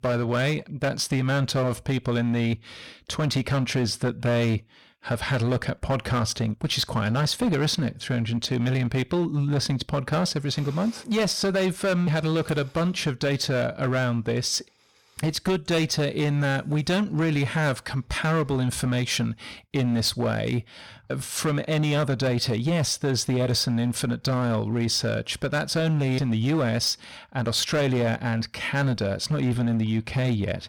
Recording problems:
distortion; slight; 12% of the sound clipped

